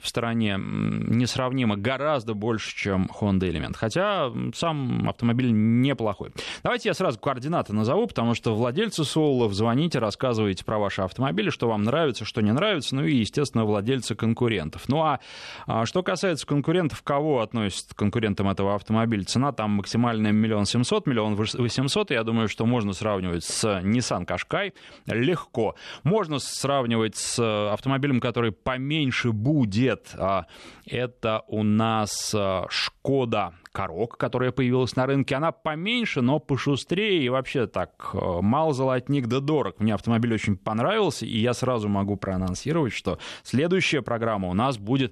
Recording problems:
none

